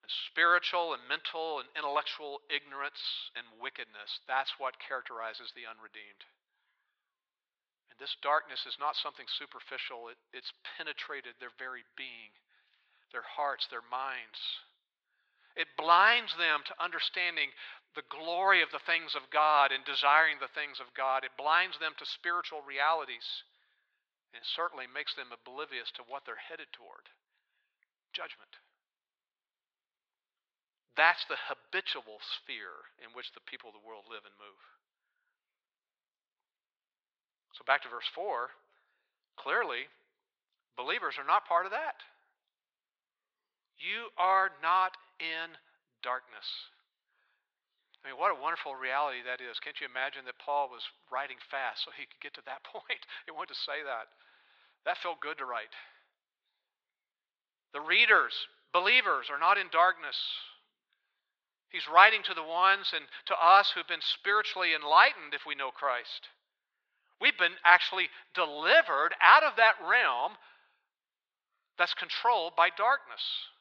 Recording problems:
thin; very; fading below 950 Hz
muffled; very slightly; fading above 3.5 kHz

